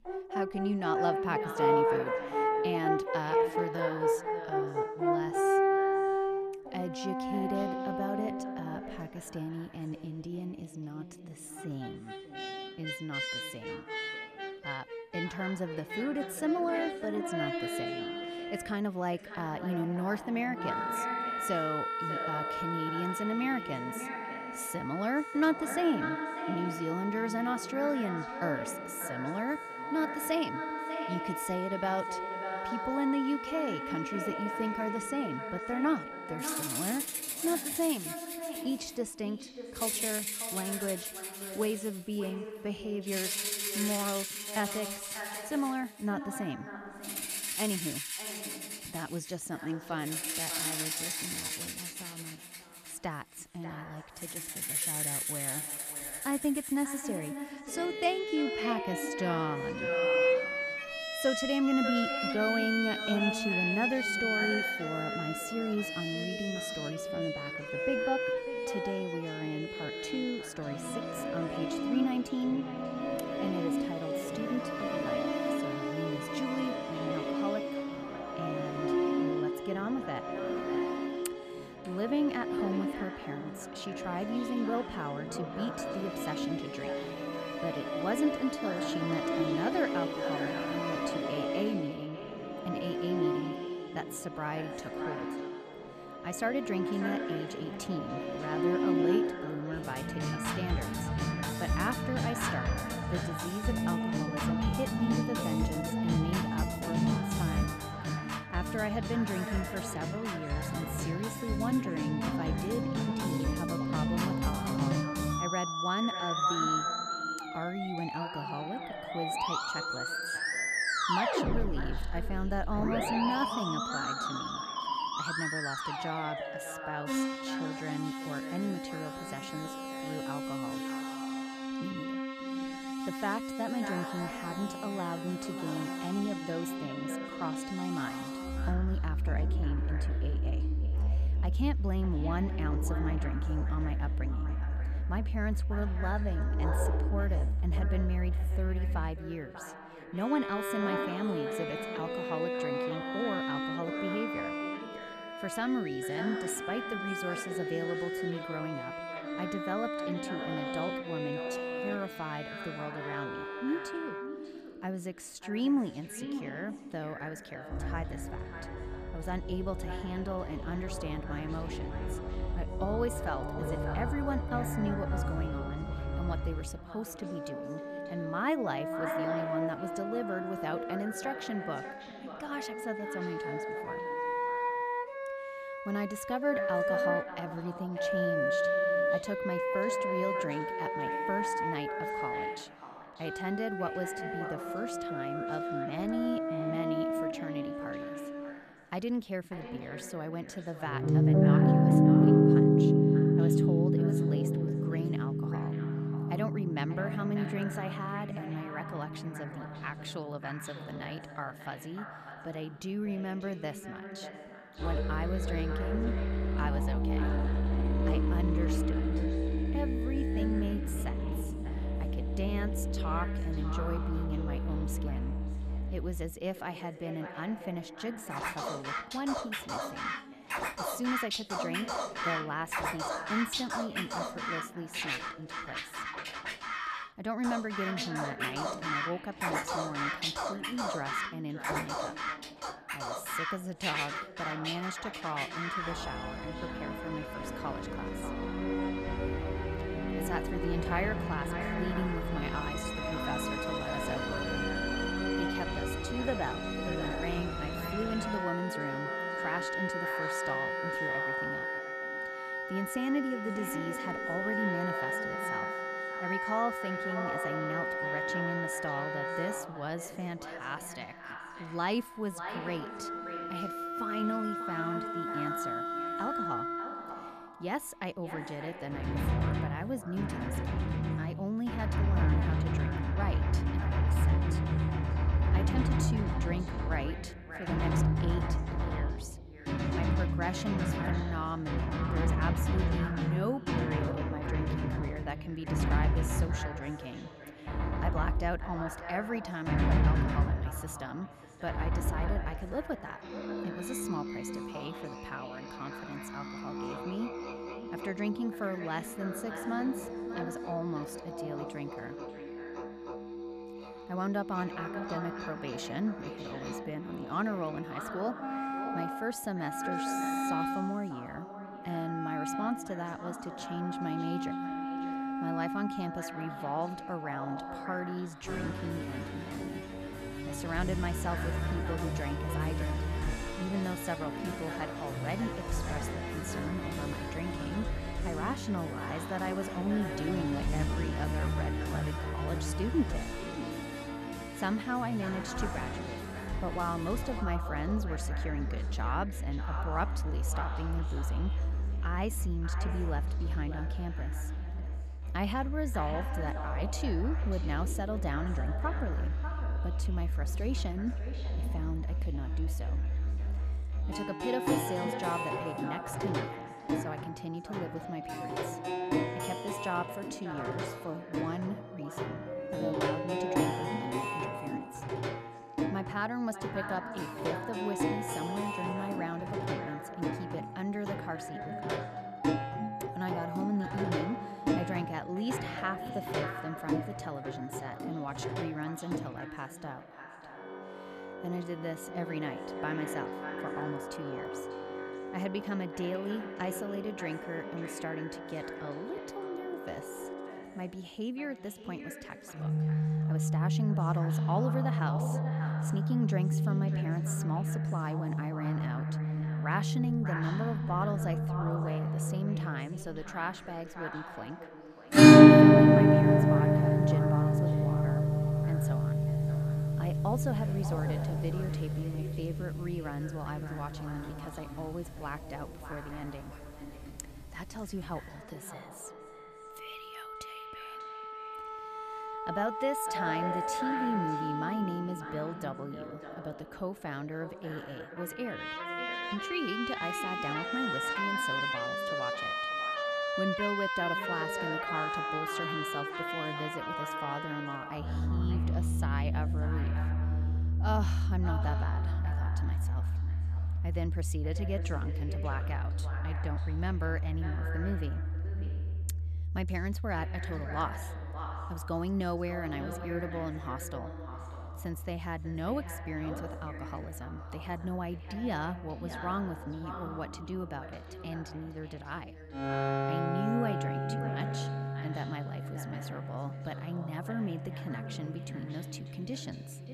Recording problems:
echo of what is said; strong; throughout; 590 ms later, 8 dB below the speech
background music; very loud; throughout; 5 dB above the speech

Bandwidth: 14.5 kHz